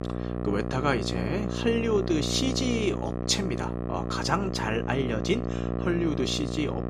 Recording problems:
electrical hum; loud; throughout; 60 Hz, 6 dB below the speech

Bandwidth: 14.5 kHz